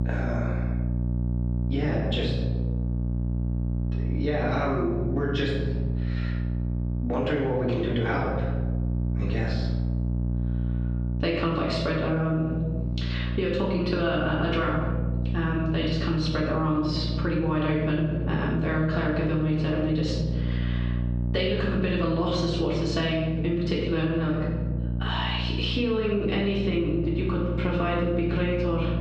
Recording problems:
off-mic speech; far
room echo; noticeable; dies away in 0.9 s
muffled; very slightly; fading above 4.5 kHz
squashed, flat; somewhat
electrical hum; noticeable; throughout; 60 Hz, 10 dB below the speech

